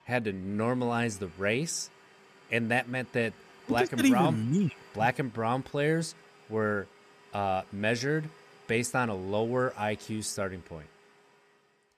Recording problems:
household noises; faint; throughout; 25 dB below the speech

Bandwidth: 14.5 kHz